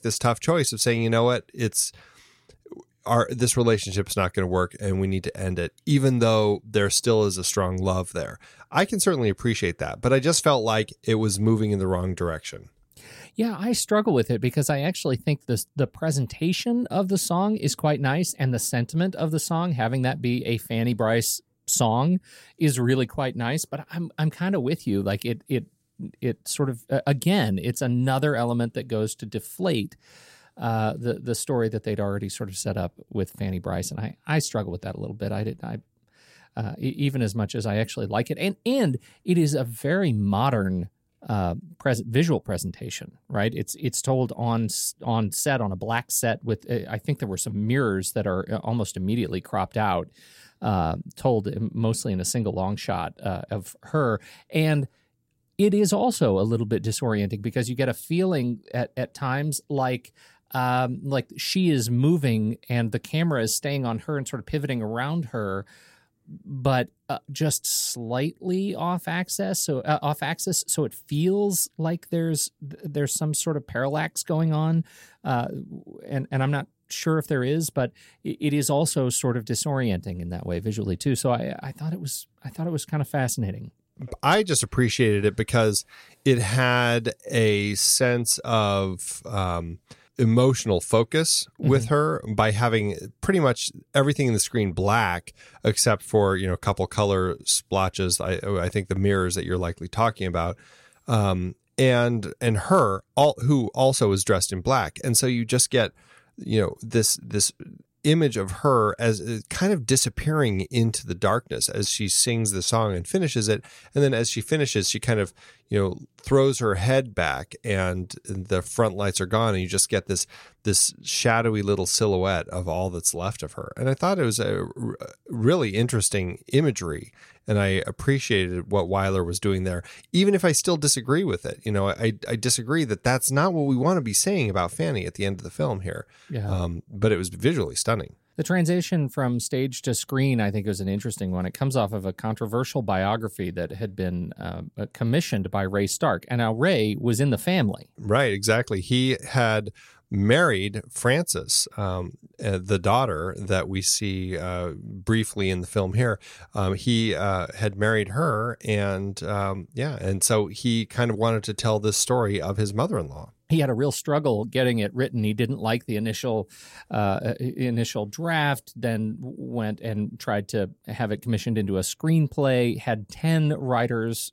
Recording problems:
none

